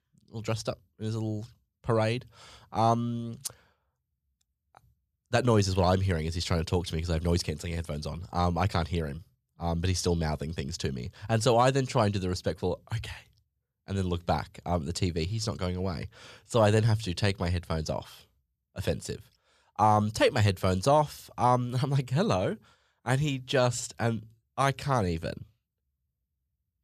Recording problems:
none

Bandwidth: 14 kHz